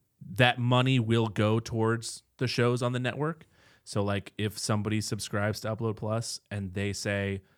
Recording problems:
none

